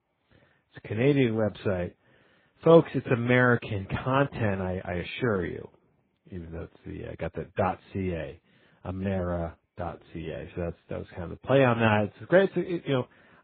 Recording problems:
garbled, watery; badly

